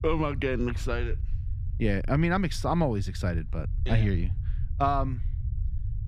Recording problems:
muffled; slightly; fading above 4 kHz
low rumble; faint; throughout; 20 dB below the speech

